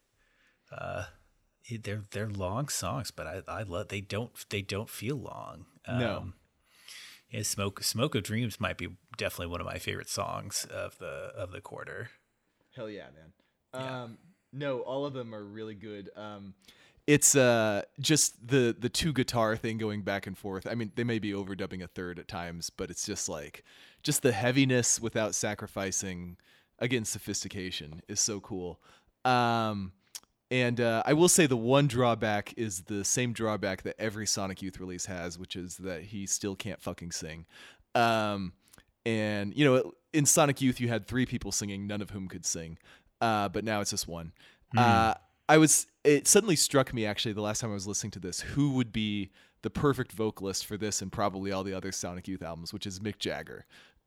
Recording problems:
none

